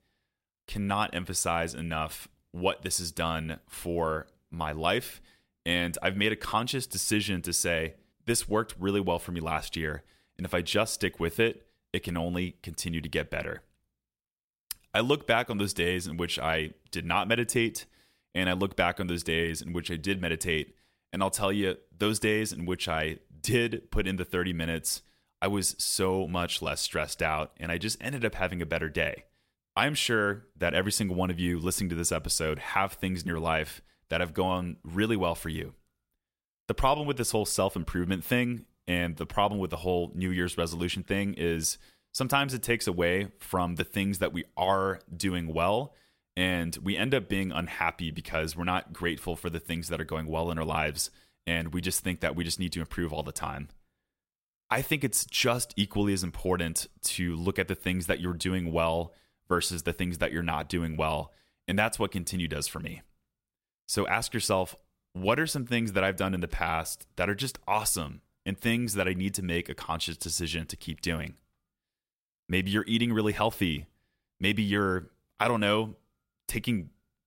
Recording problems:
none

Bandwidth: 16 kHz